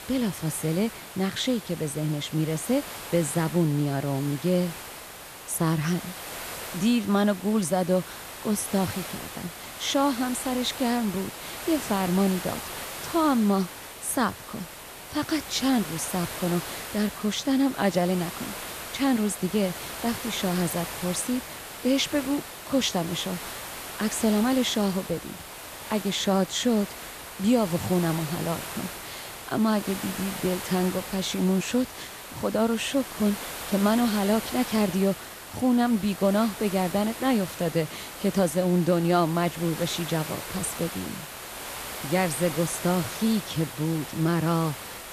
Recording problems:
hiss; loud; throughout; 10 dB below the speech

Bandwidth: 14.5 kHz